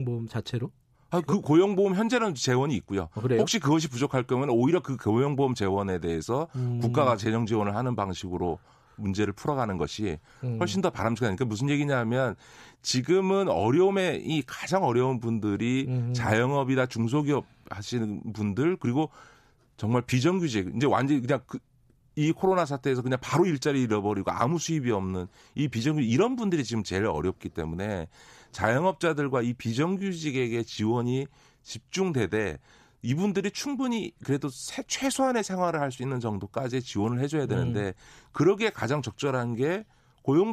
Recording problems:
abrupt cut into speech; at the start and the end

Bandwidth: 14.5 kHz